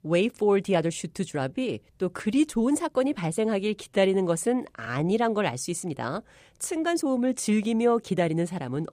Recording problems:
uneven, jittery; strongly; from 0.5 to 8.5 s

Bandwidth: 15 kHz